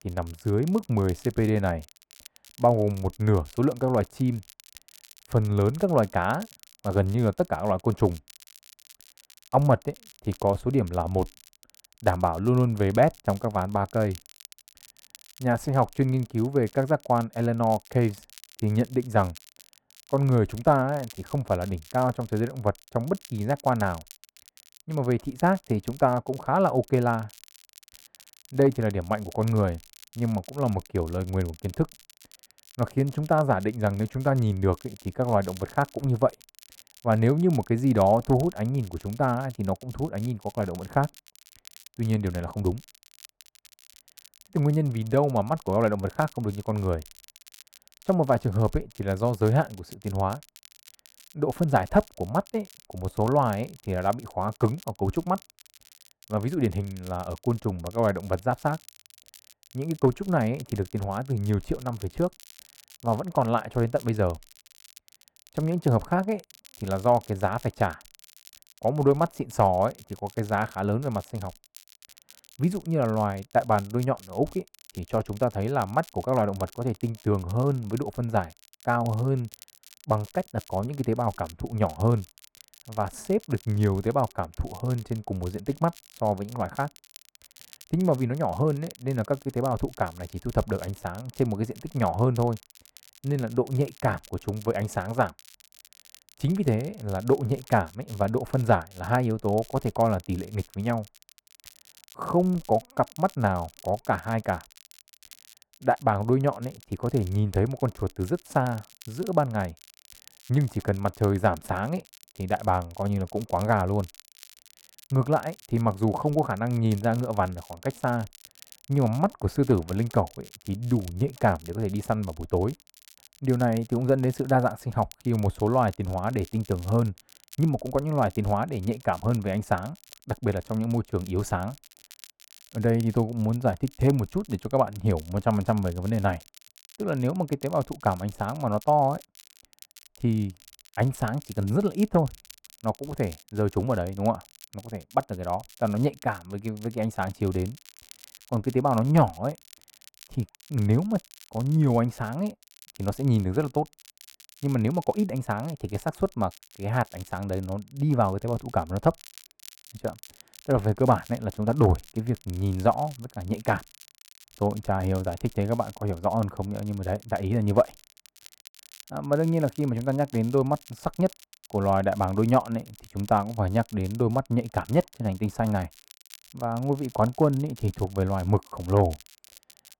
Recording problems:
muffled; slightly; fading above 2.5 kHz
crackle, like an old record; faint; 25 dB below the speech

